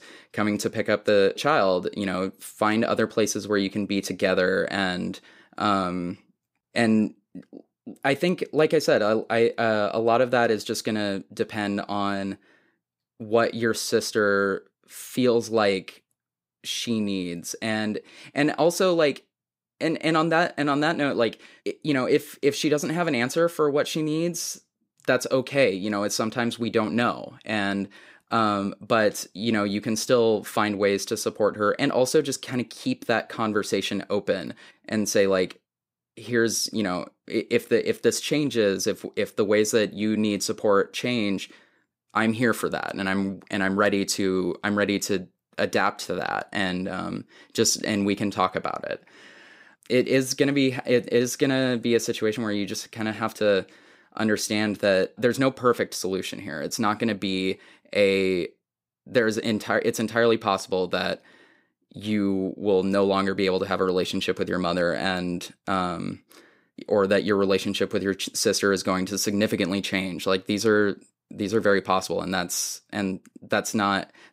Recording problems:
none

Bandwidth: 15.5 kHz